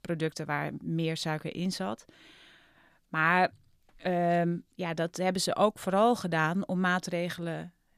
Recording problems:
none

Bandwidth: 14.5 kHz